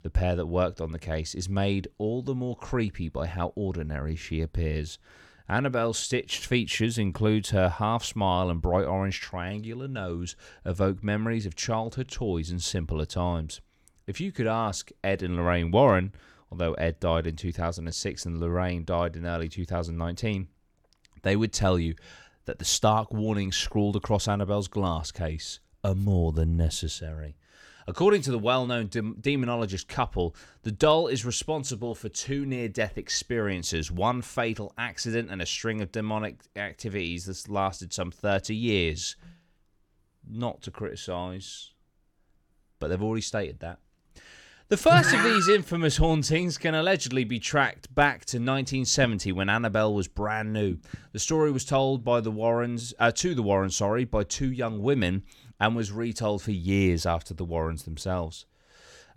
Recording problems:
none

